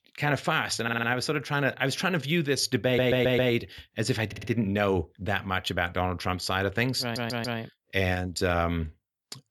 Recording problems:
audio stuttering; 4 times, first at 1 s

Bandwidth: 19 kHz